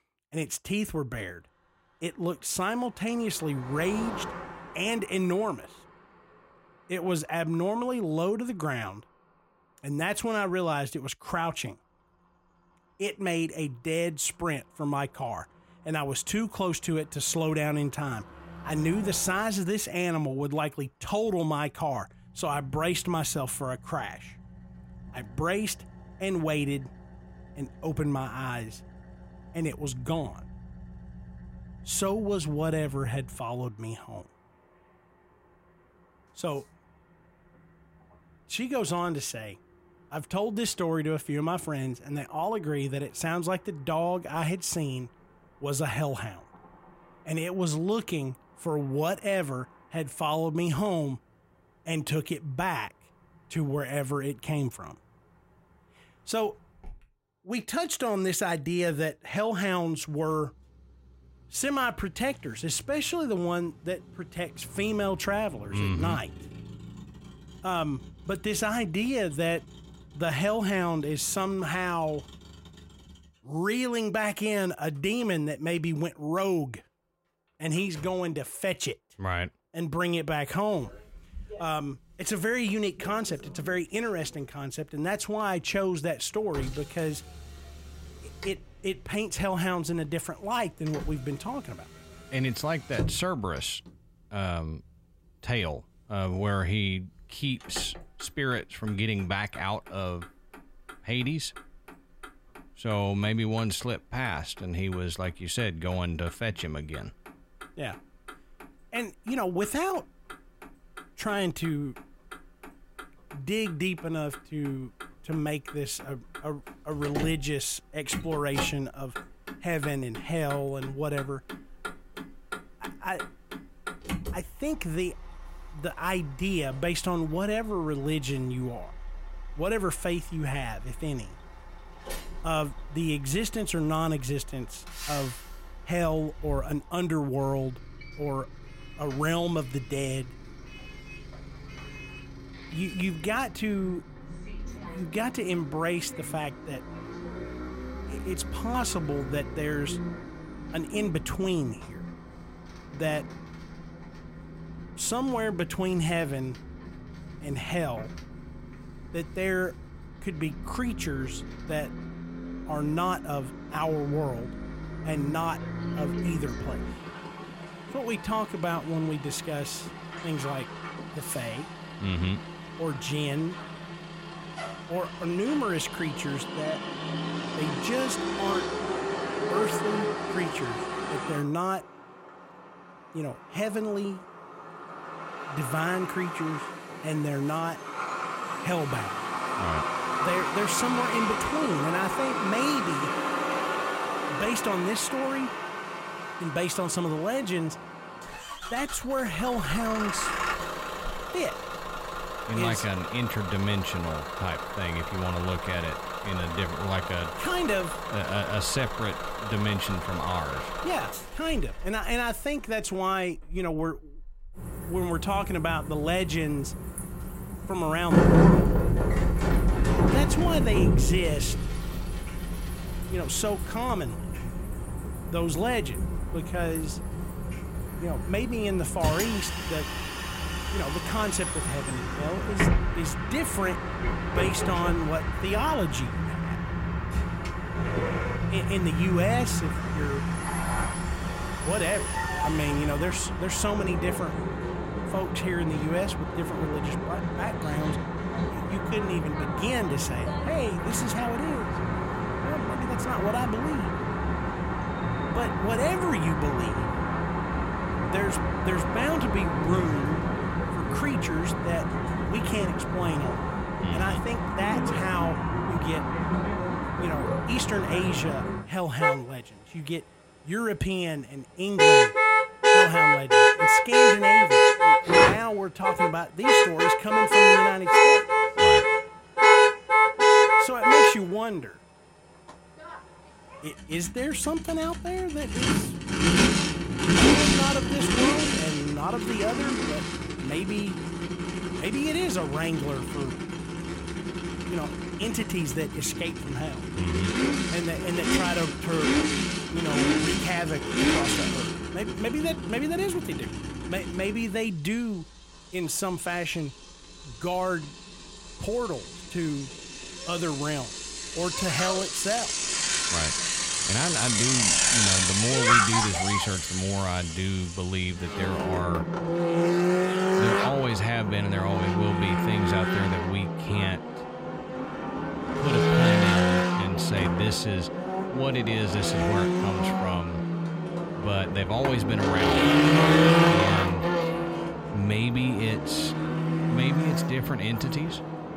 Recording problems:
traffic noise; very loud; throughout; 4 dB above the speech

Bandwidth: 16 kHz